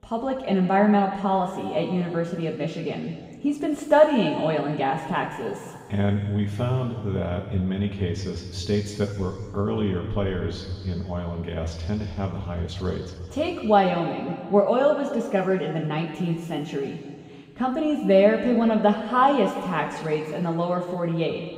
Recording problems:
off-mic speech; far
room echo; noticeable; dies away in 1.9 s

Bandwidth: 15.5 kHz